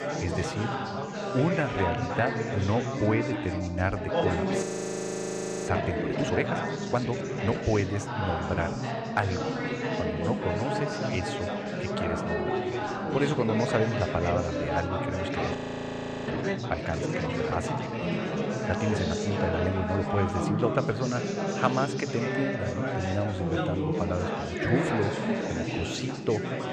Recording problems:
chatter from many people; very loud; throughout; 1 dB above the speech
audio freezing; at 4.5 s for 1 s and at 16 s for 0.5 s

